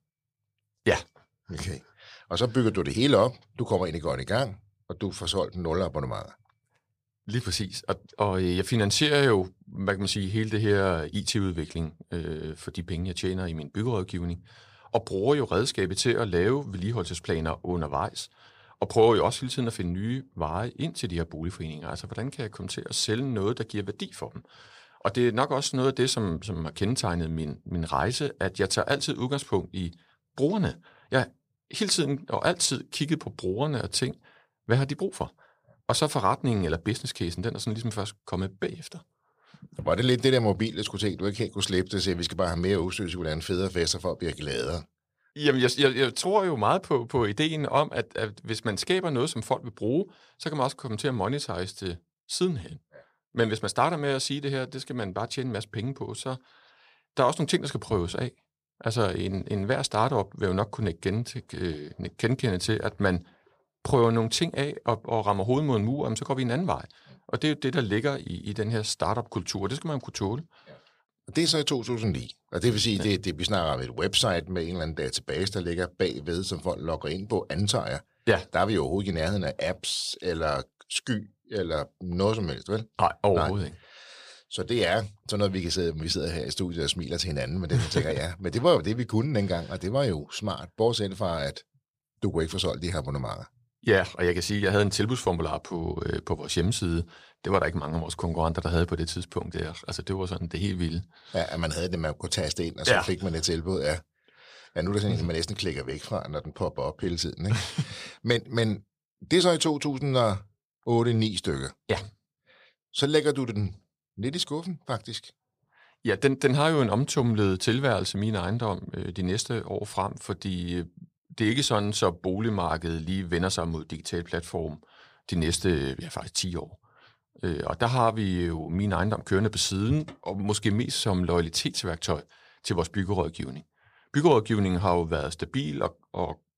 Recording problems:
none

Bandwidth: 15 kHz